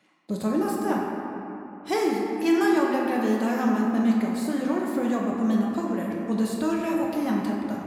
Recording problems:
room echo; noticeable; dies away in 2.5 s
off-mic speech; somewhat distant

